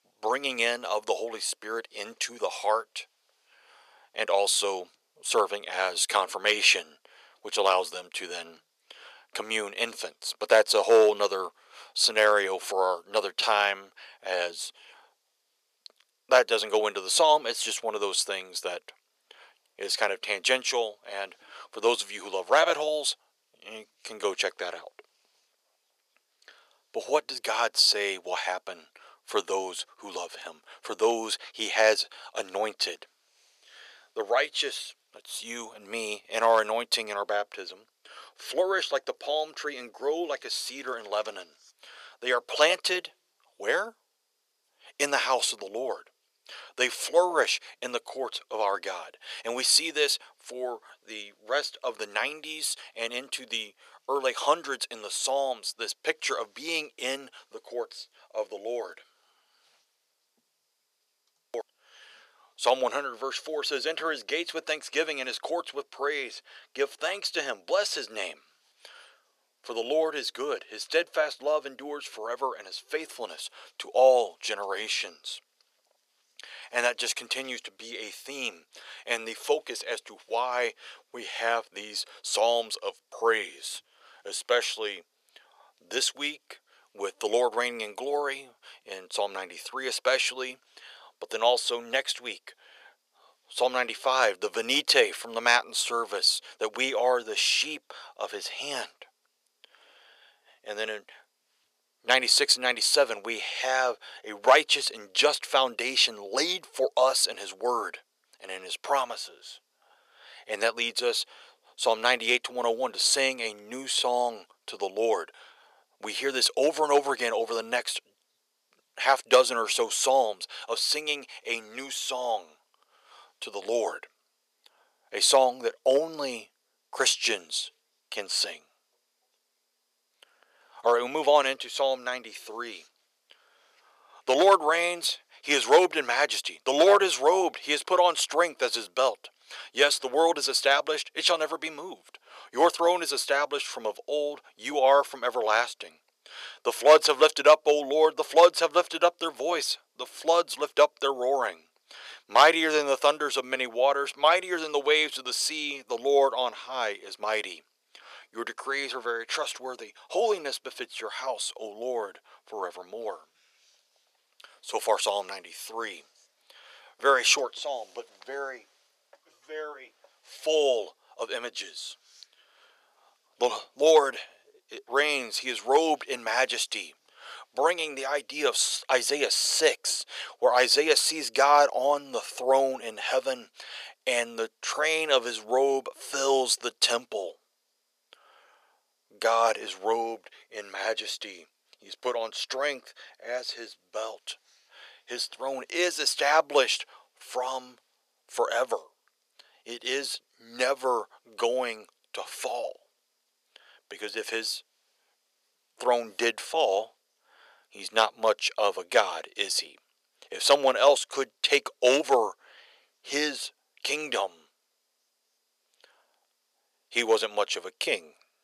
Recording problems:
thin; very; fading below 500 Hz

